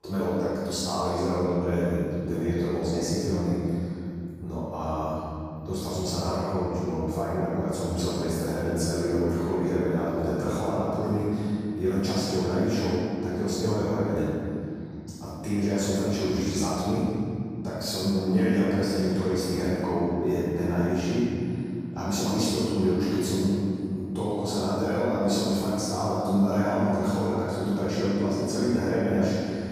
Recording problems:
room echo; strong; dies away in 2.9 s
off-mic speech; far

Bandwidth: 15.5 kHz